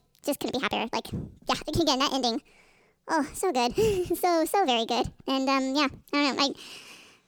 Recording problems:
wrong speed and pitch; too fast and too high; 1.5 times normal speed

